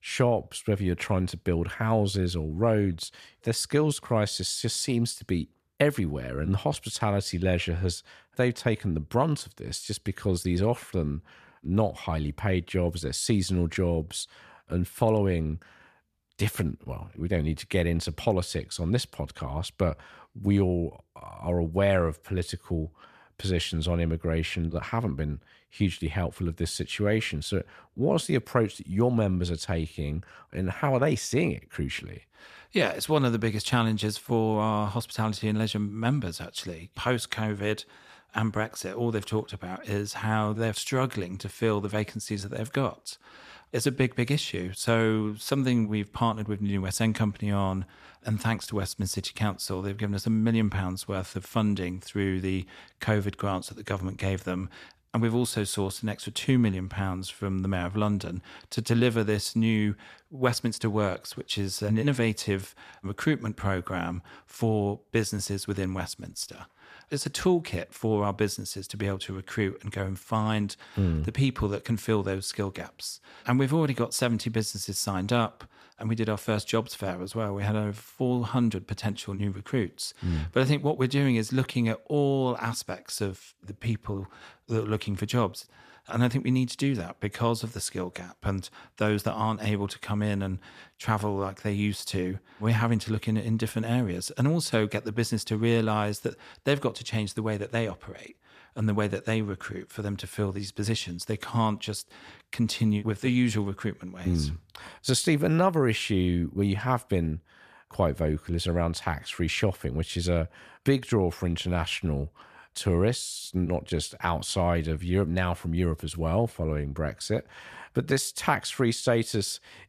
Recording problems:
none

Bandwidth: 14.5 kHz